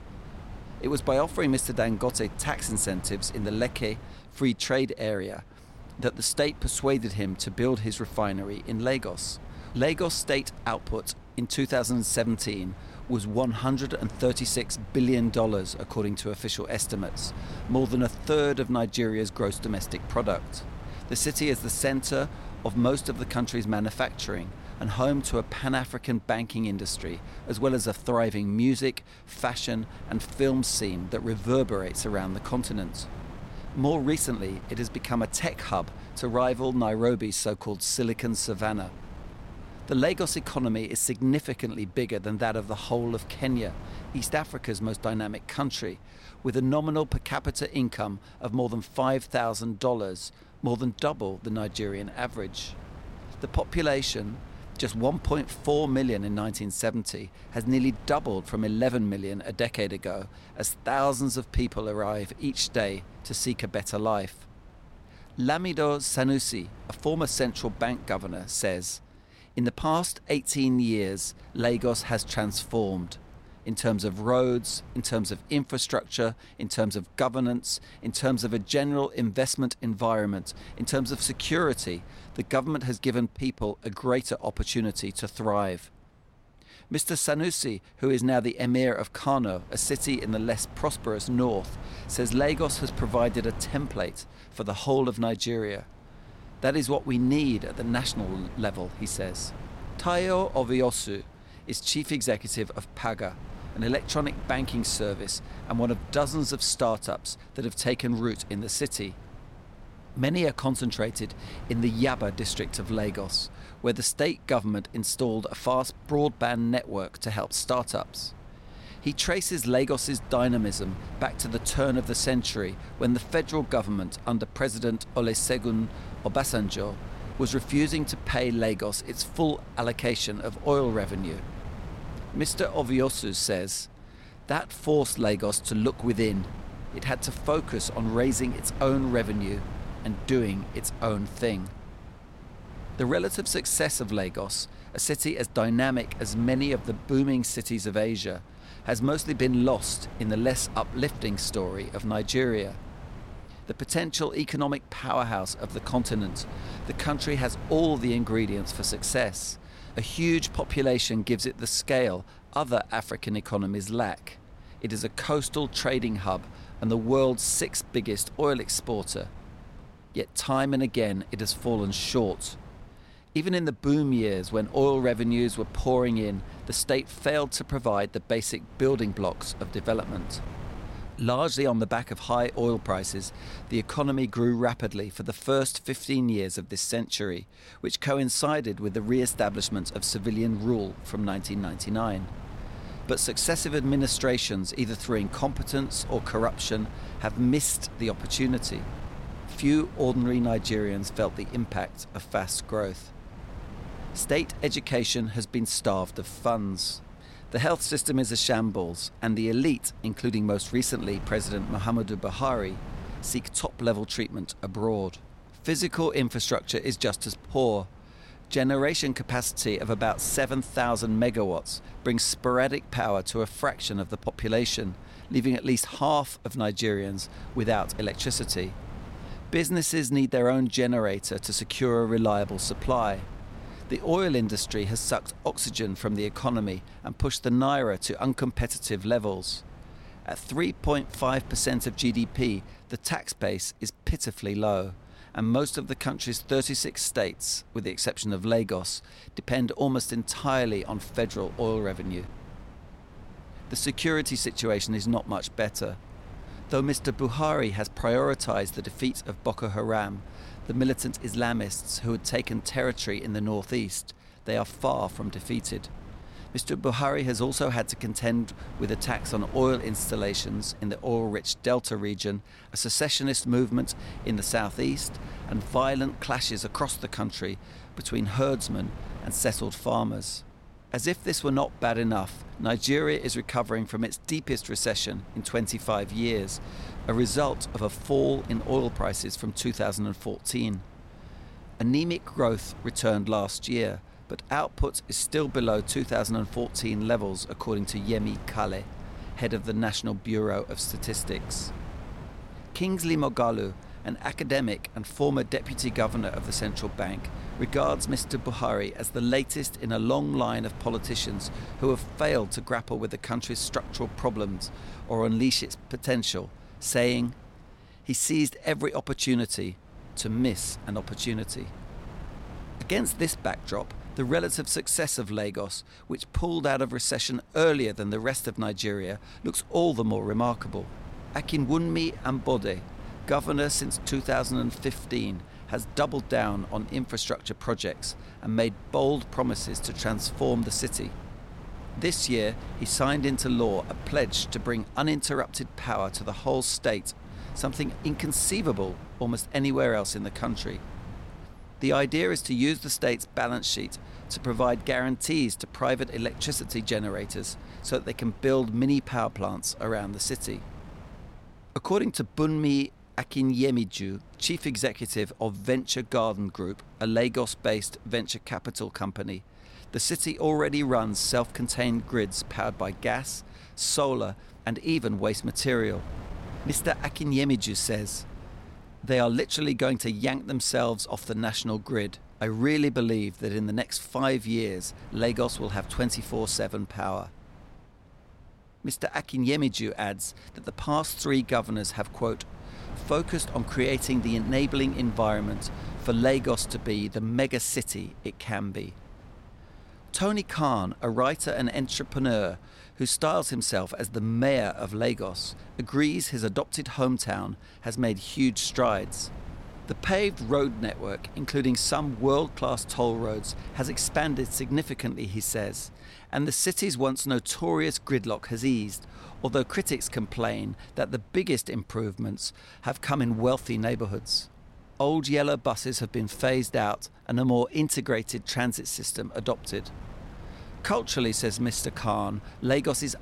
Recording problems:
wind noise on the microphone; occasional gusts; 20 dB below the speech

